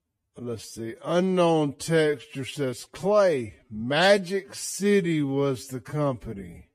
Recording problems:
wrong speed, natural pitch; too slow; 0.6 times normal speed

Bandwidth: 14.5 kHz